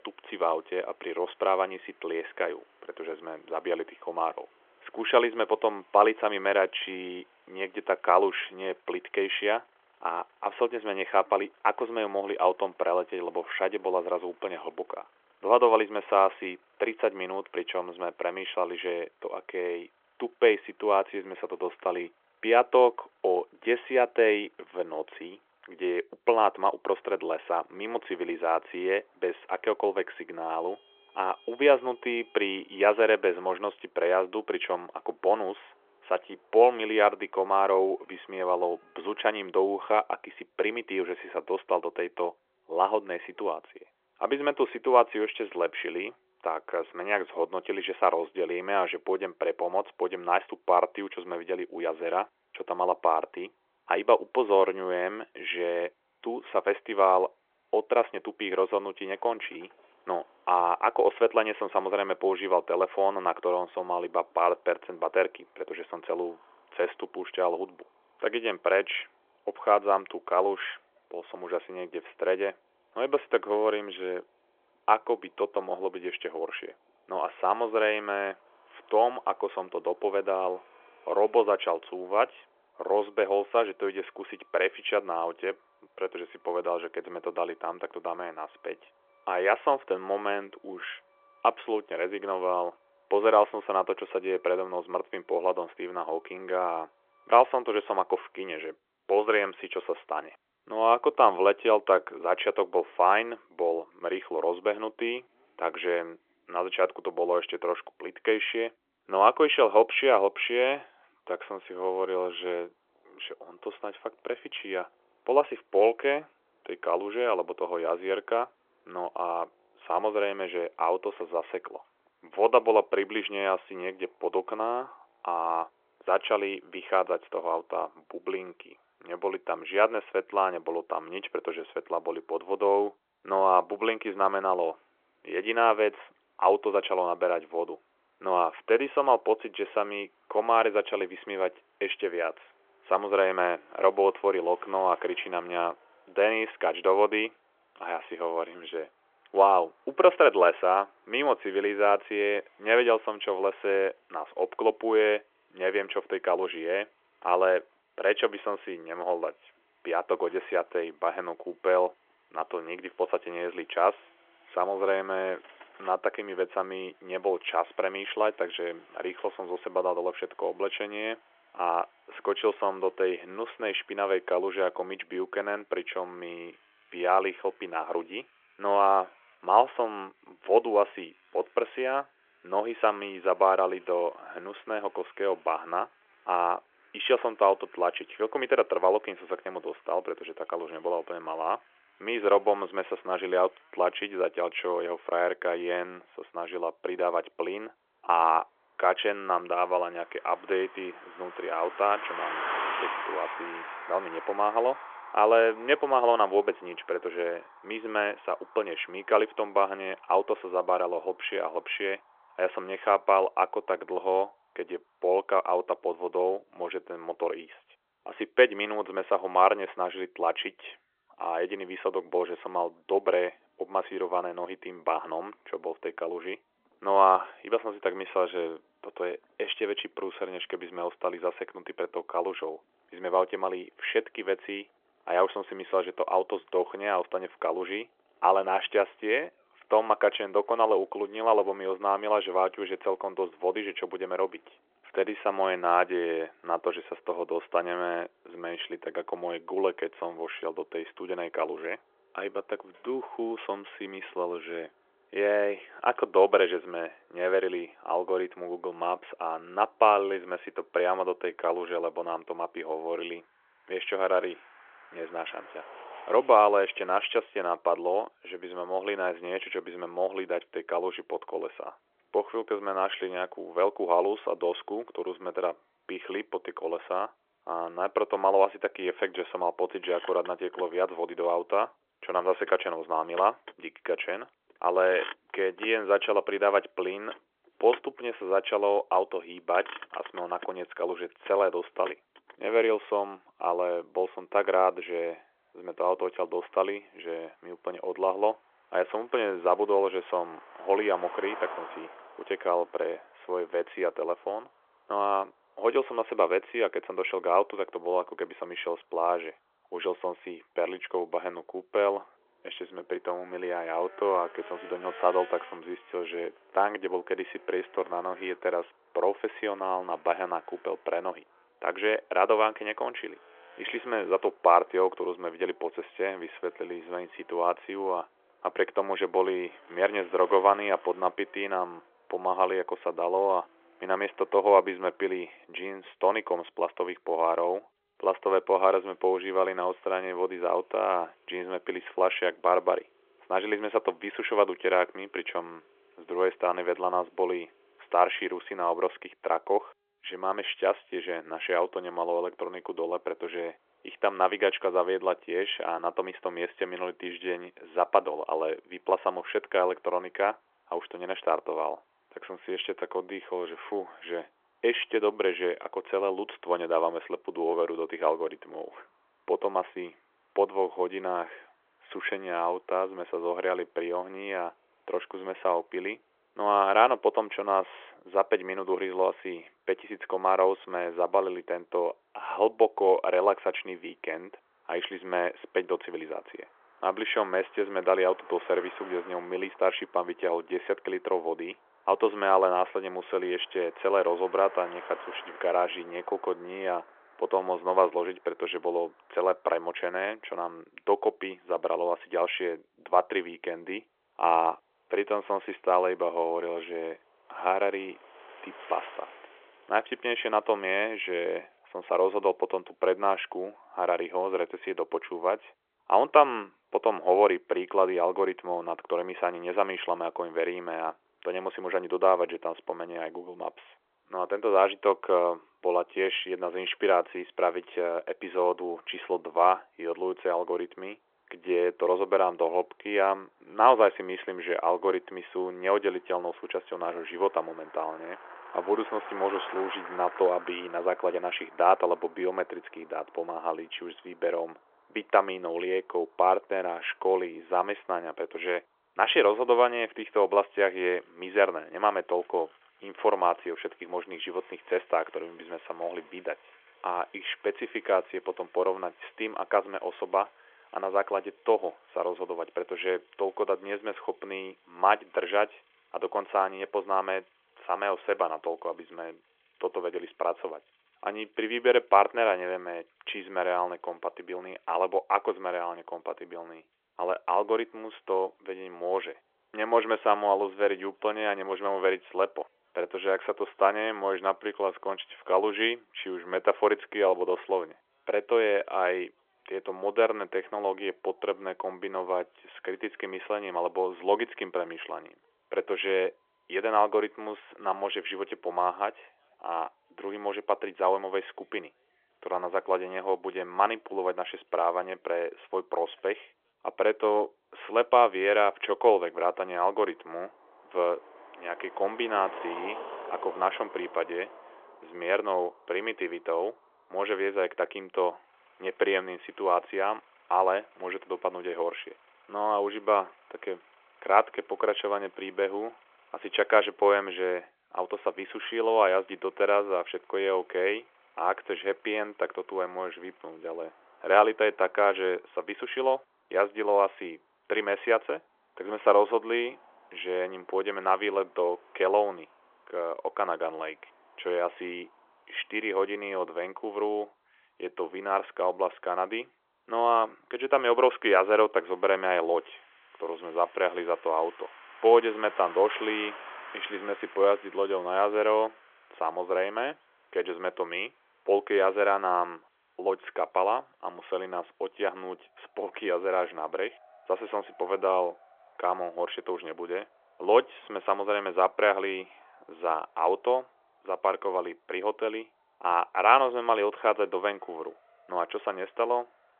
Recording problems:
phone-call audio; nothing above 3.5 kHz
traffic noise; faint; throughout; 20 dB below the speech

